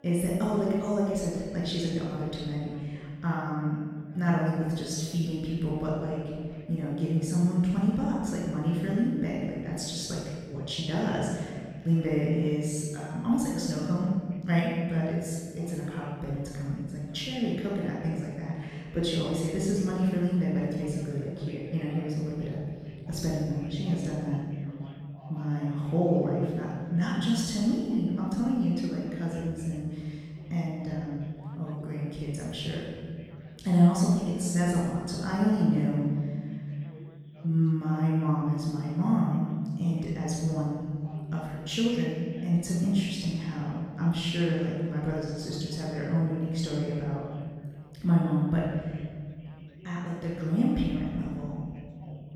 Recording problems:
room echo; strong; dies away in 1.8 s
off-mic speech; far
background chatter; faint; throughout; 3 voices, 25 dB below the speech

